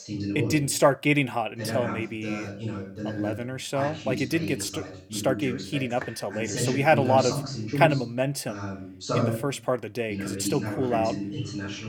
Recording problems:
voice in the background; loud; throughout; 5 dB below the speech

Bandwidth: 17 kHz